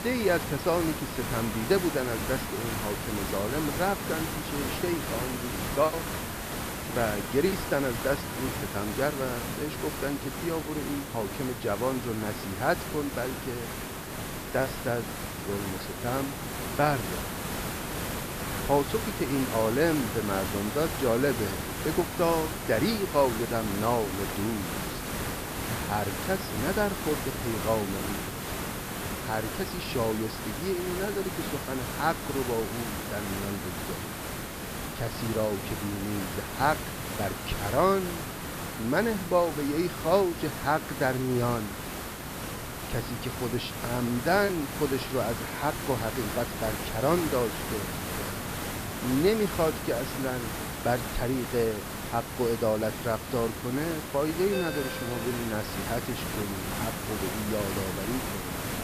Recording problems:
high frequencies cut off; noticeable; nothing above 5.5 kHz
hiss; loud; throughout; 4 dB below the speech
alarms or sirens; noticeable; throughout; 20 dB below the speech
background chatter; very faint; throughout; 4 voices, 30 dB below the speech
choppy; very; from 5 to 8.5 s, at 15 s and at 44 s; 9% of the speech affected

